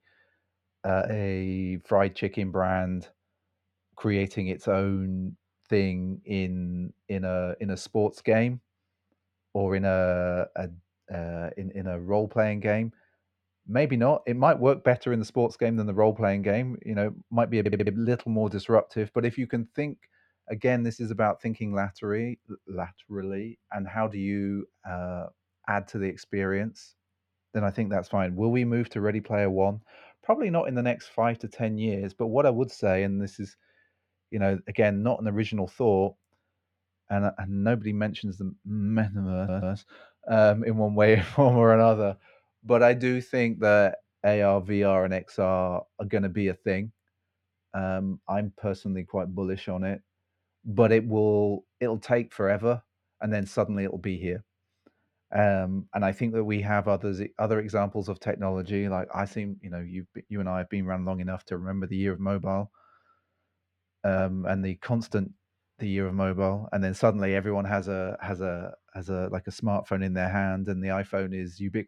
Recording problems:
muffled; slightly; fading above 4 kHz
audio stuttering; at 18 s and at 39 s

